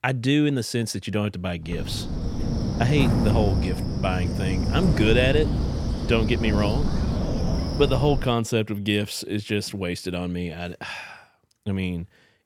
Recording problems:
wind noise on the microphone; heavy; from 1.5 to 8.5 s; 6 dB below the speech

